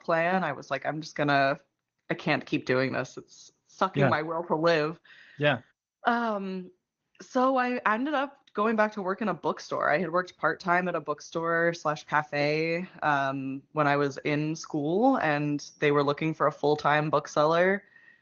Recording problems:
garbled, watery; slightly; nothing above 6.5 kHz

